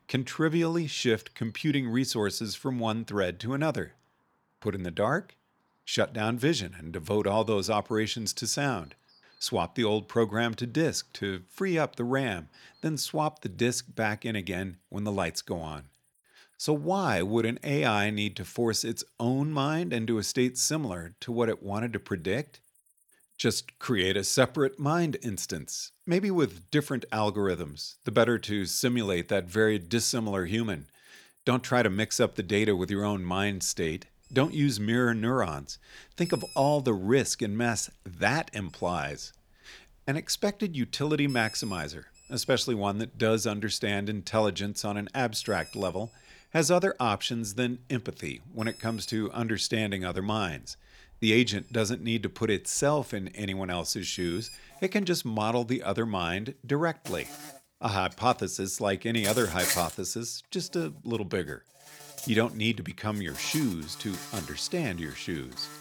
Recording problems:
animal sounds; noticeable; throughout; 10 dB below the speech

